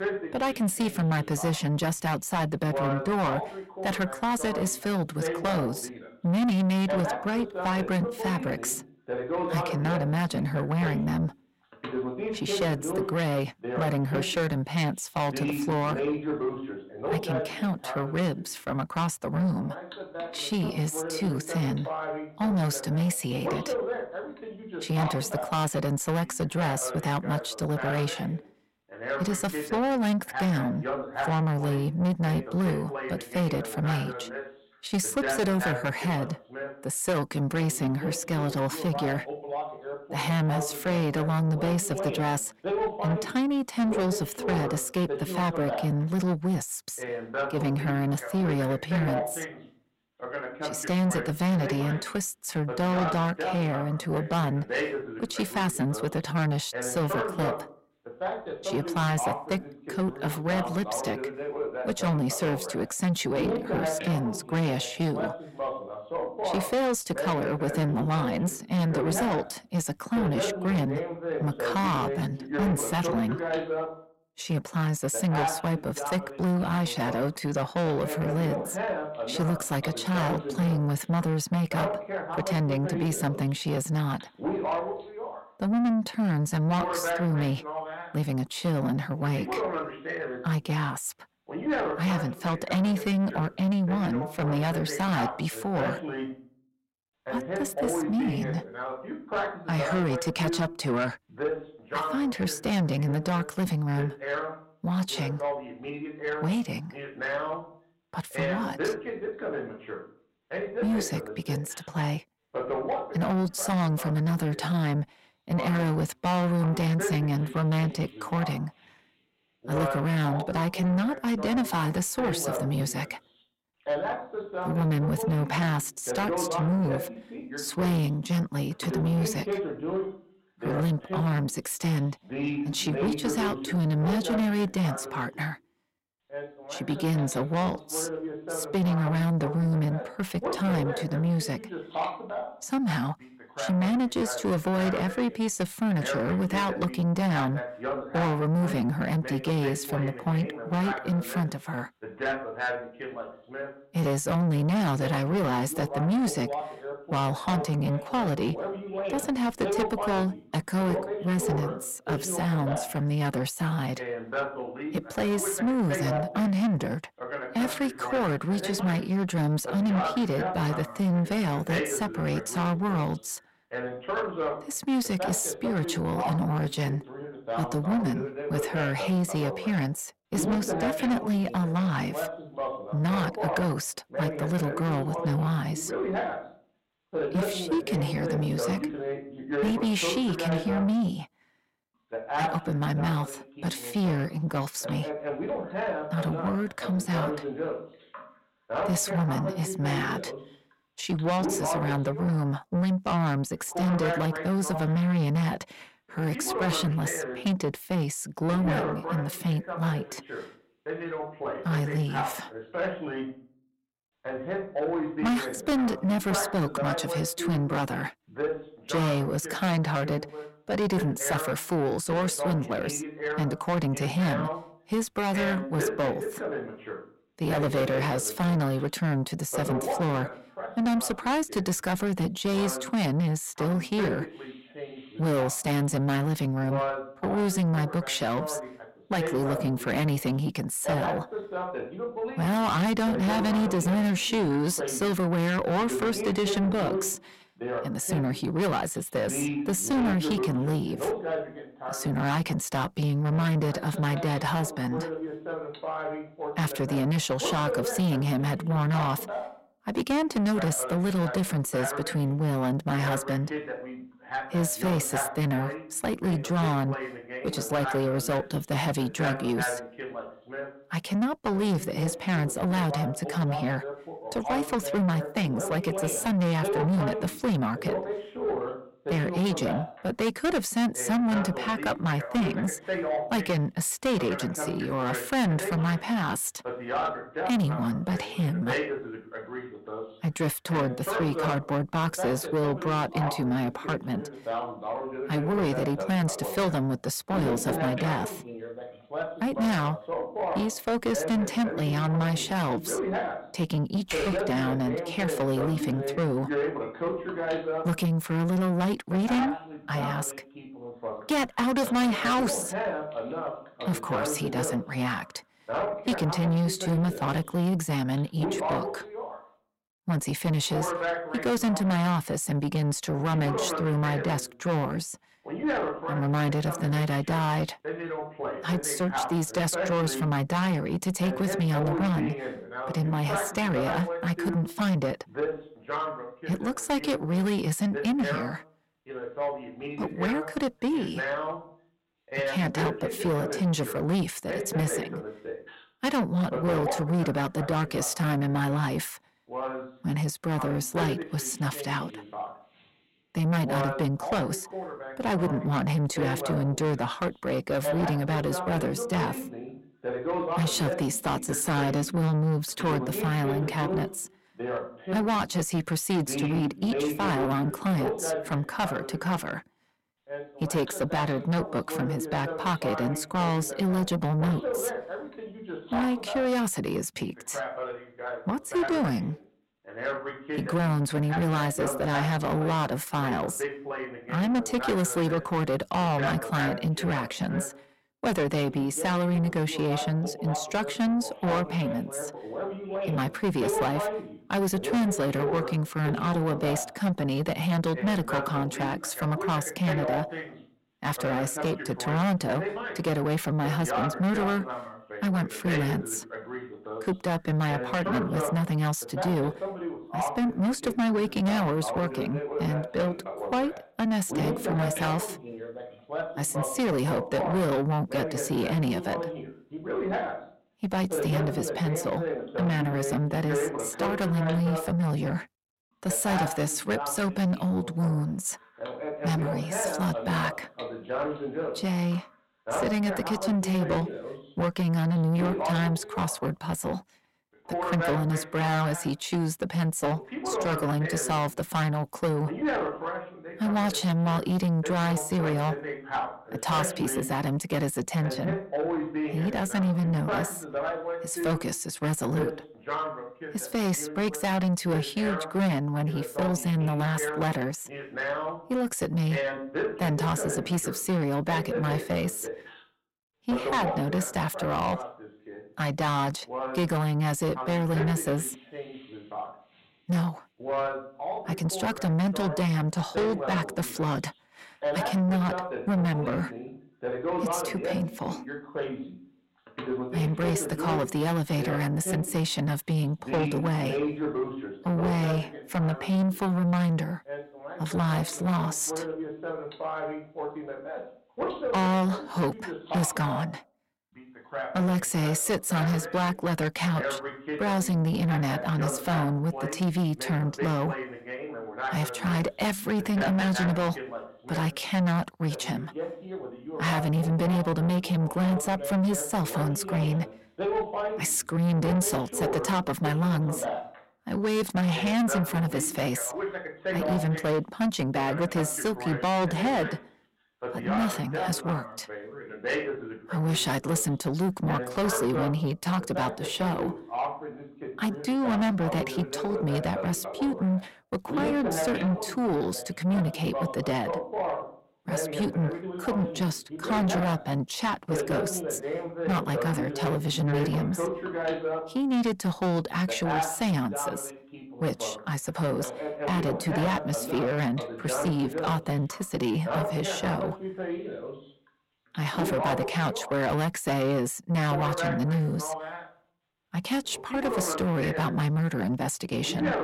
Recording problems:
distortion; heavy; 8 dB below the speech
voice in the background; loud; throughout; 6 dB below the speech
keyboard typing; noticeable; at 5:04; peak 5 dB below the speech

